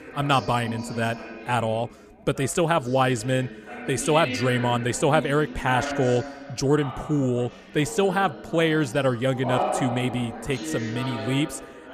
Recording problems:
background chatter; loud; throughout; 3 voices, 9 dB below the speech

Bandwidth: 15 kHz